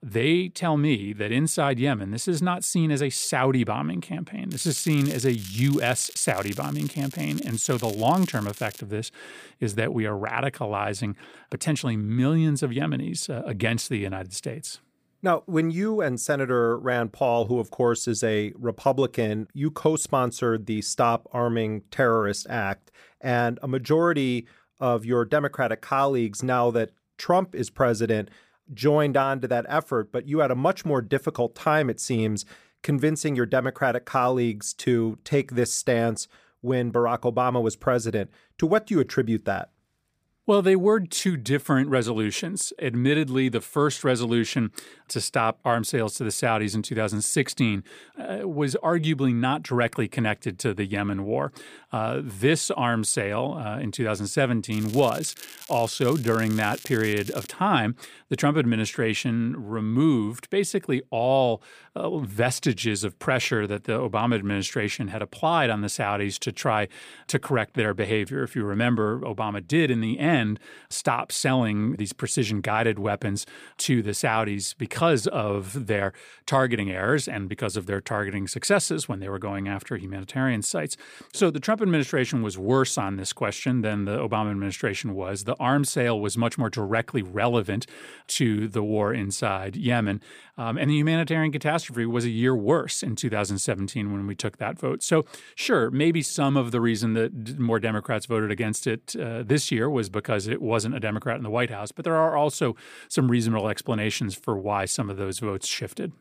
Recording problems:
crackling; noticeable; from 4.5 to 9 s and from 55 to 58 s; 15 dB below the speech

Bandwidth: 15 kHz